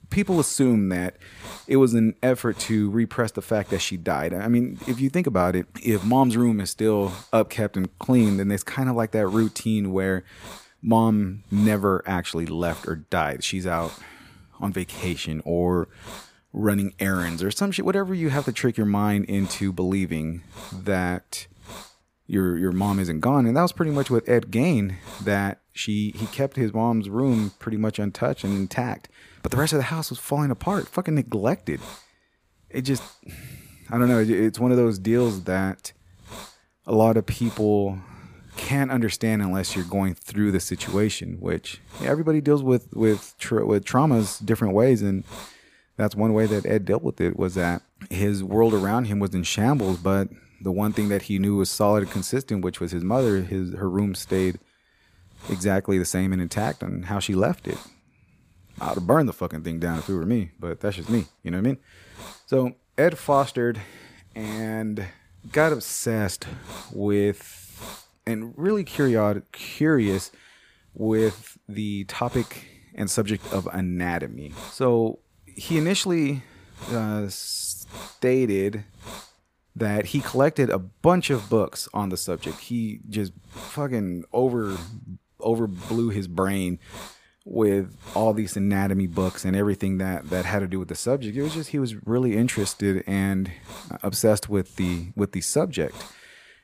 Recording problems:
hiss; noticeable; throughout; 20 dB below the speech

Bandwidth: 15 kHz